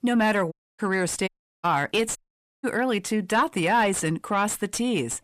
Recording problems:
distortion; slight; 10 dB below the speech
audio cutting out; at 0.5 s, at 1.5 s and at 2 s

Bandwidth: 14.5 kHz